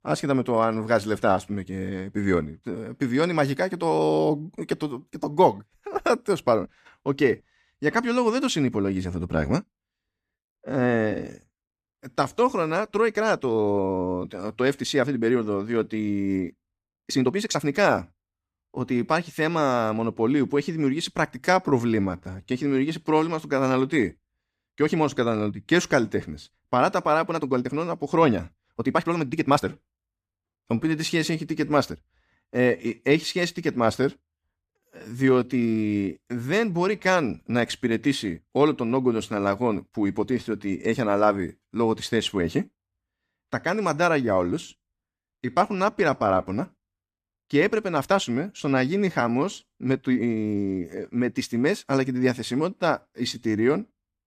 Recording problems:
uneven, jittery; strongly; from 12 to 54 s

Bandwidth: 14.5 kHz